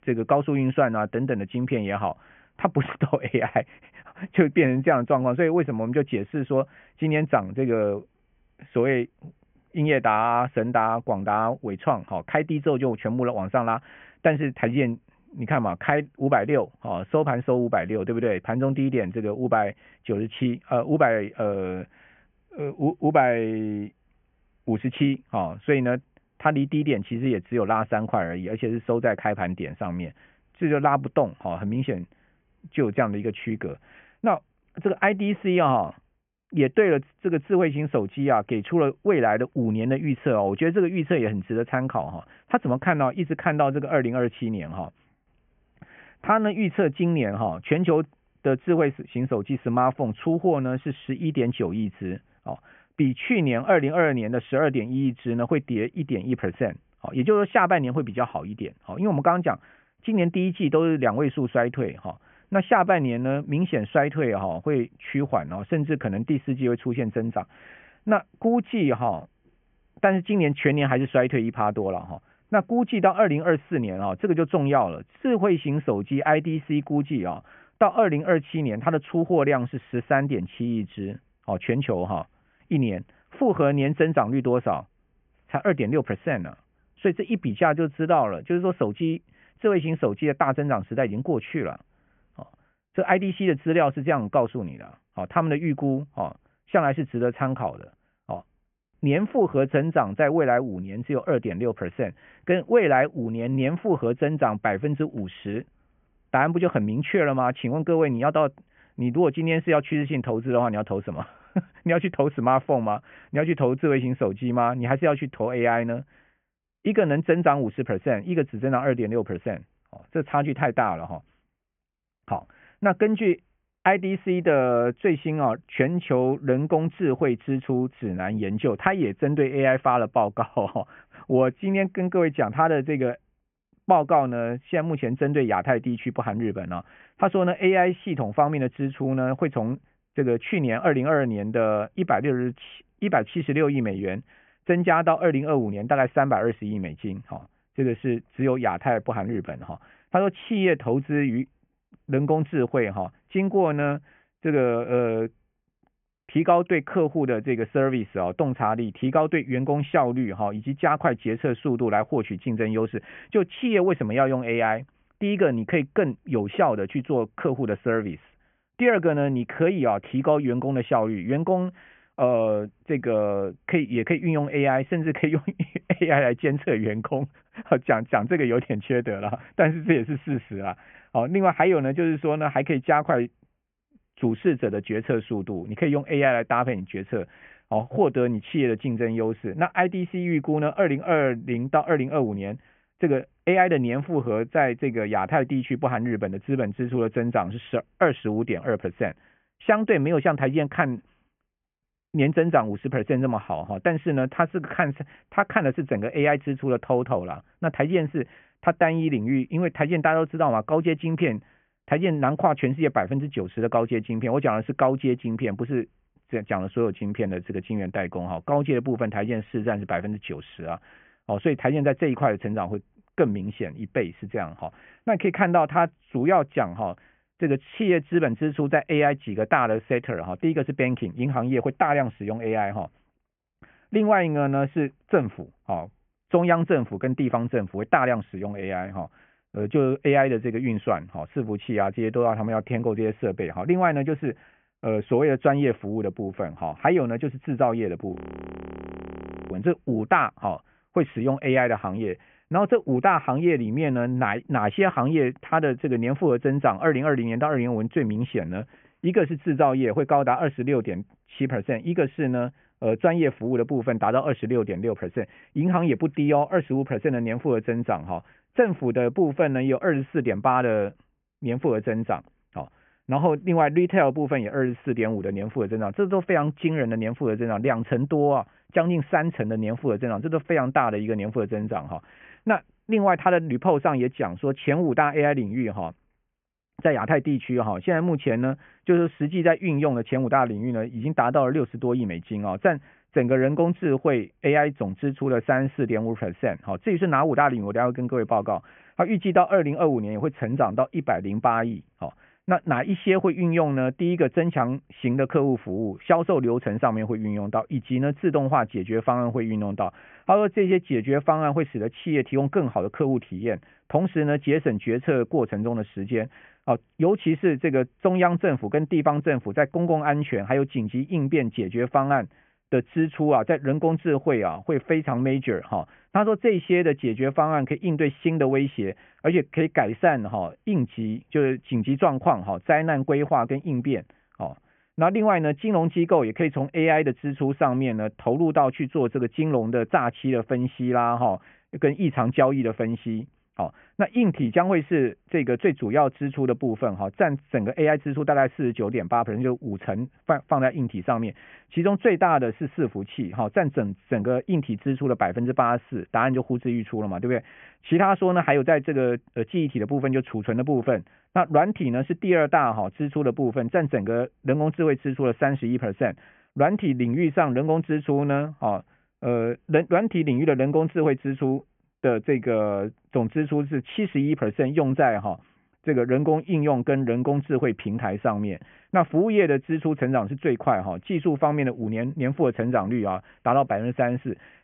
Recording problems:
high frequencies cut off; severe; nothing above 3 kHz
audio freezing; at 4:08 for 1.5 s

